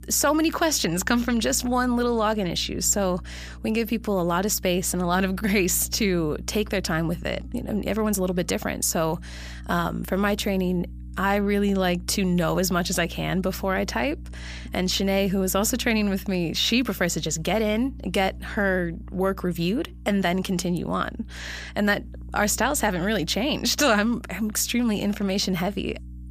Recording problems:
electrical hum; faint; throughout; 60 Hz, 30 dB below the speech

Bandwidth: 15 kHz